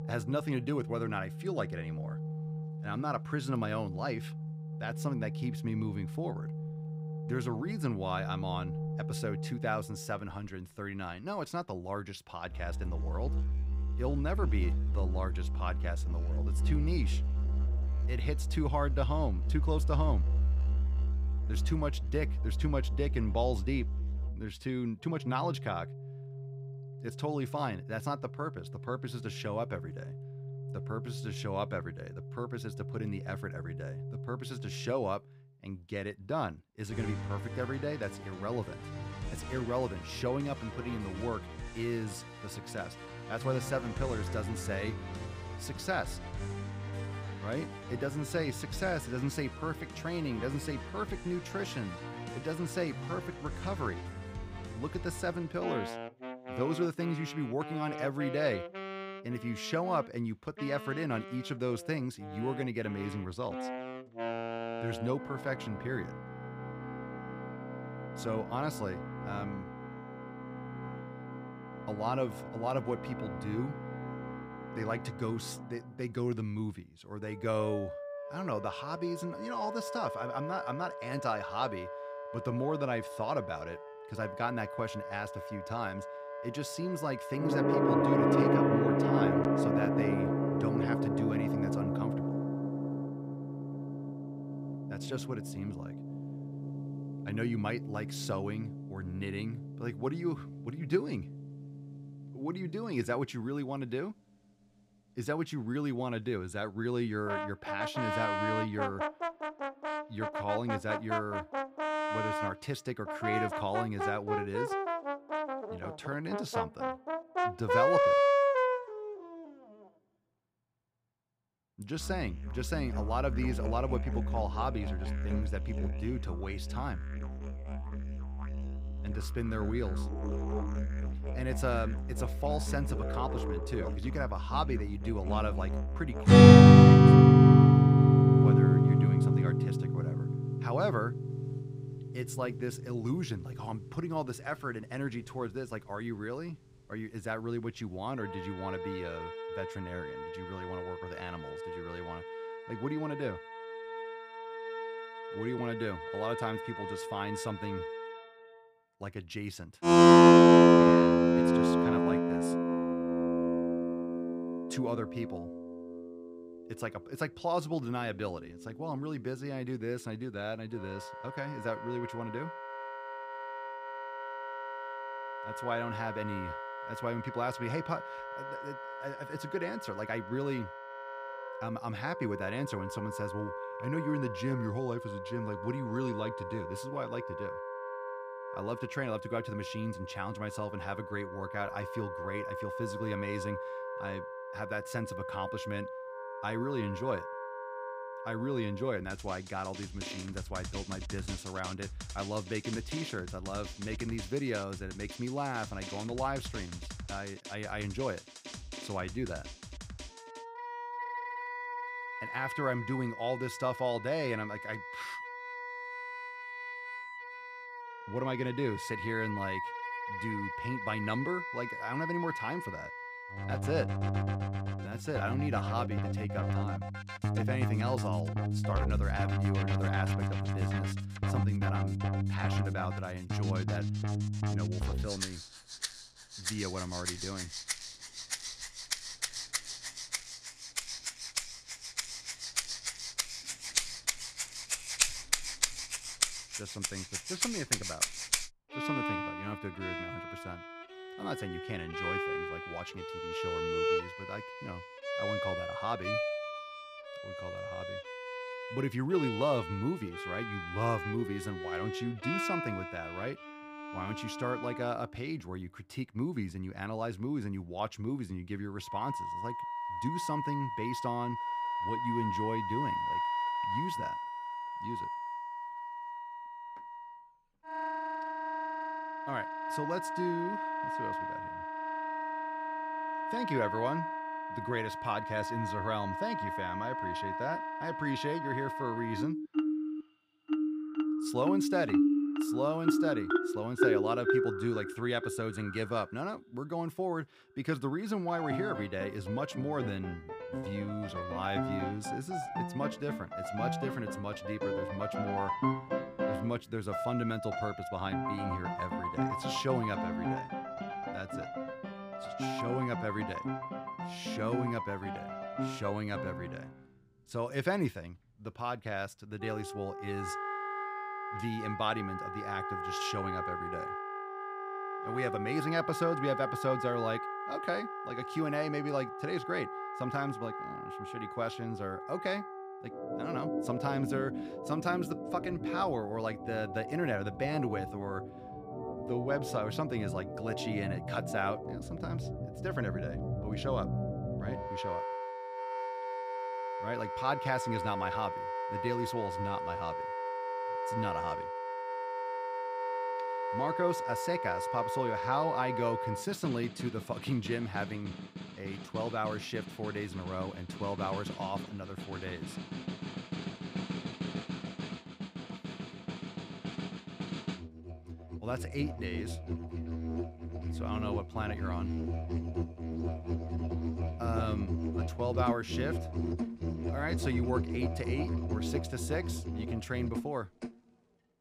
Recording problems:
background music; very loud; throughout; 4 dB above the speech

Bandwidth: 15.5 kHz